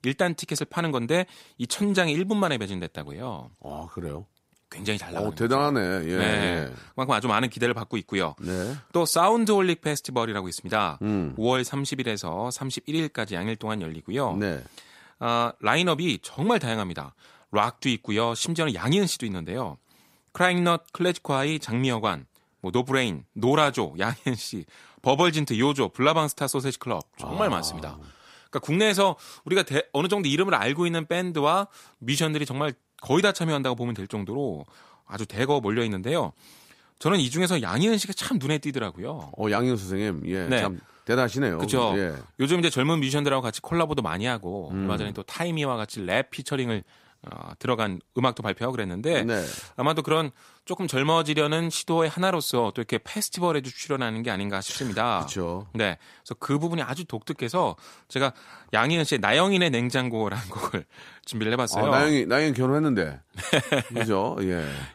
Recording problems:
none

